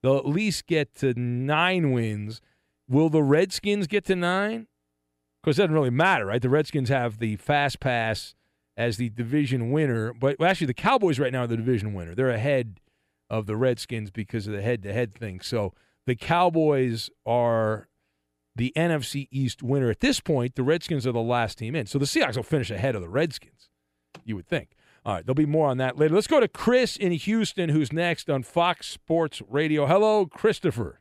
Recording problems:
none

